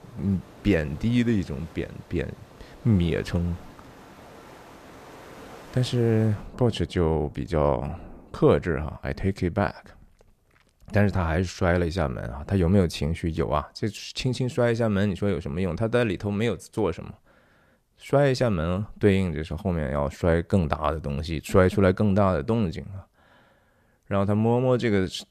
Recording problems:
rain or running water; faint; until 9 s; 20 dB below the speech

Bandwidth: 14.5 kHz